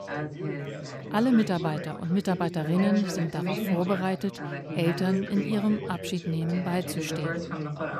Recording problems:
background chatter; loud; throughout; 4 voices, 6 dB below the speech

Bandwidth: 14.5 kHz